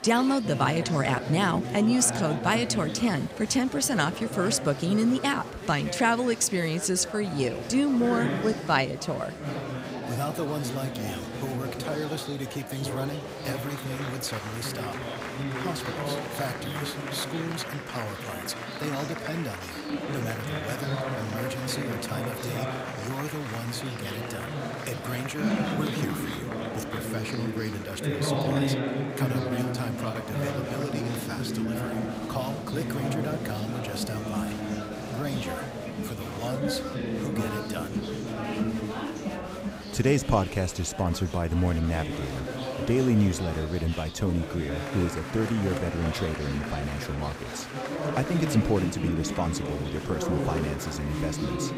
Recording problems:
murmuring crowd; loud; throughout; 3 dB below the speech

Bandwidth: 15.5 kHz